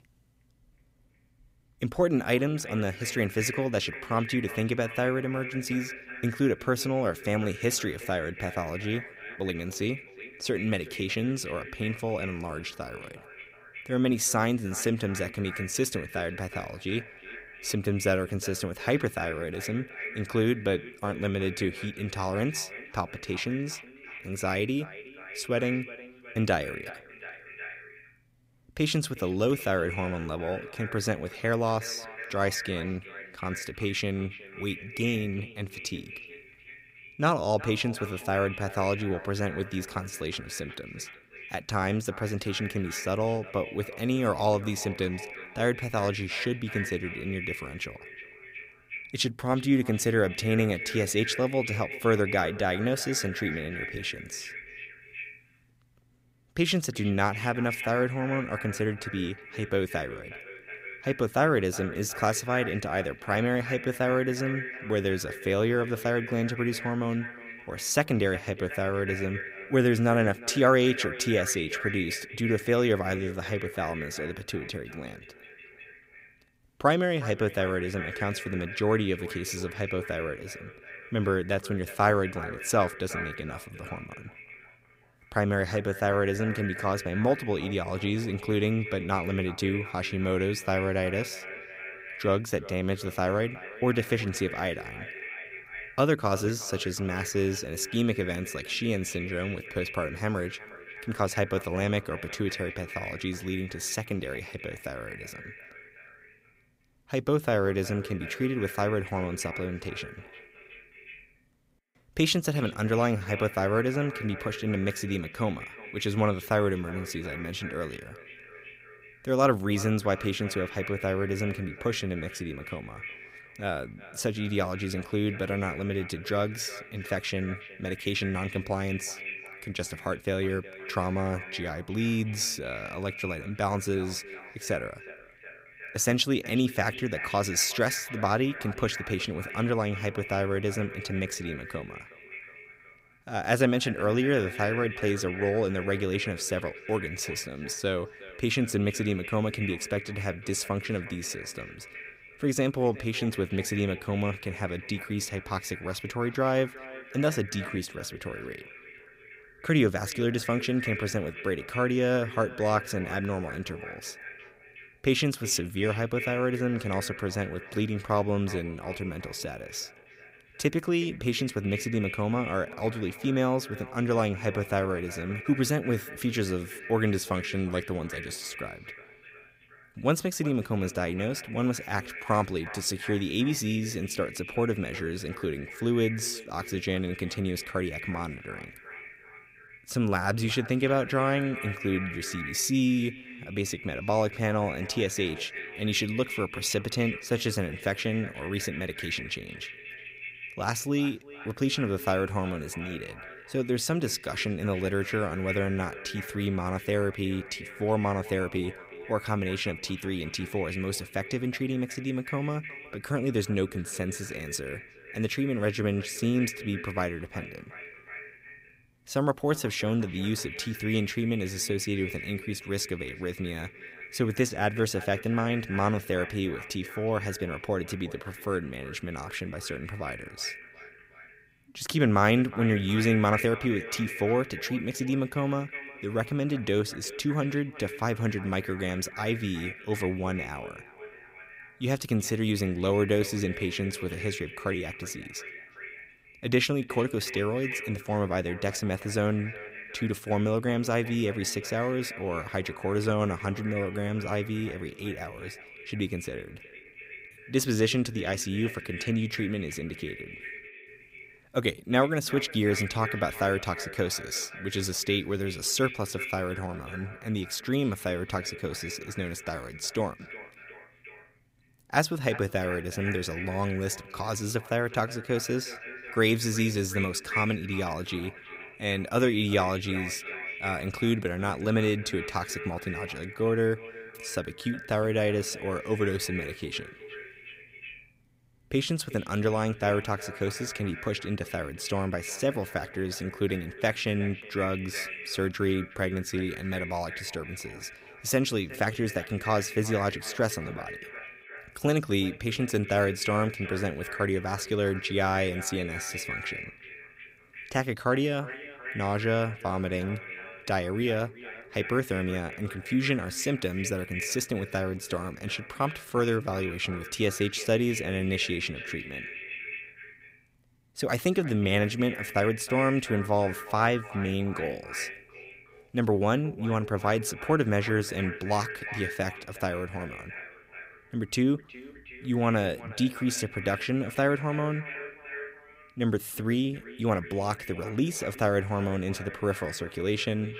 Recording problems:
echo of what is said; strong; throughout; 370 ms later, 10 dB below the speech
uneven, jittery; slightly; from 9.5 s to 5:35

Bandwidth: 15.5 kHz